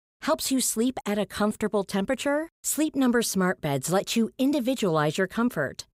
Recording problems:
none

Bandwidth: 15.5 kHz